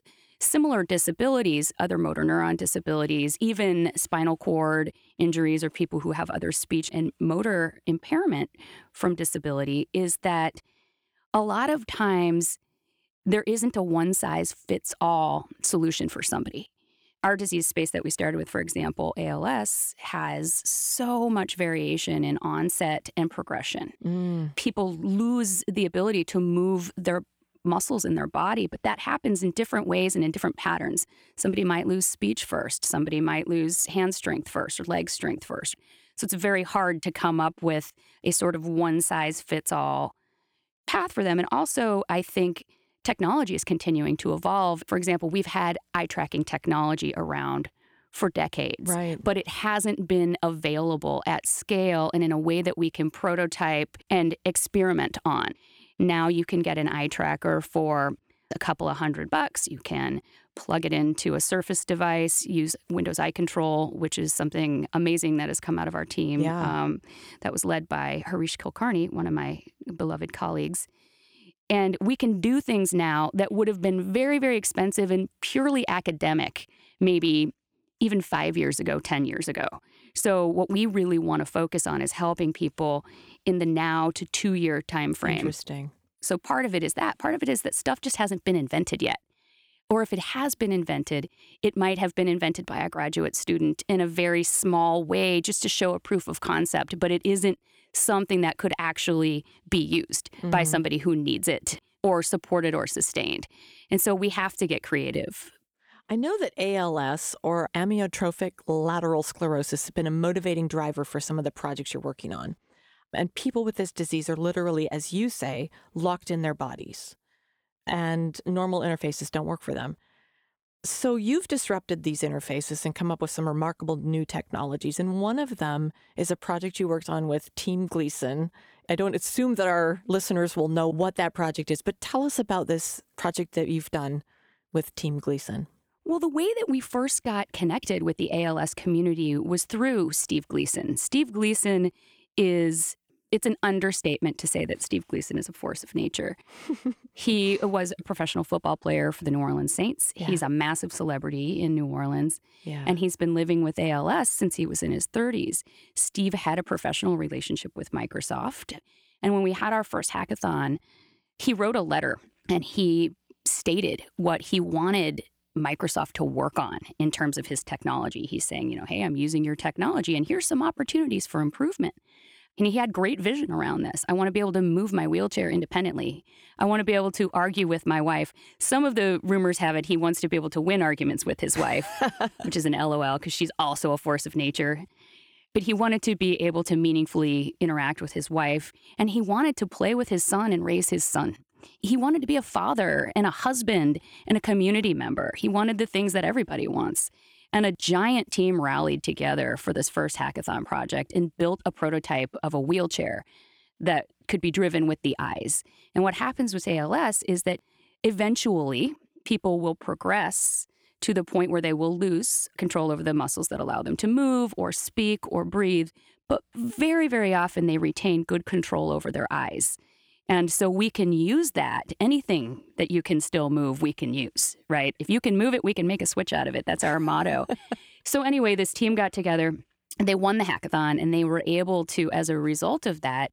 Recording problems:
none

